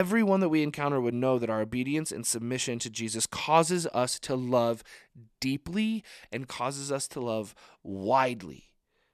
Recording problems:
abrupt cut into speech; at the start

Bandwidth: 13.5 kHz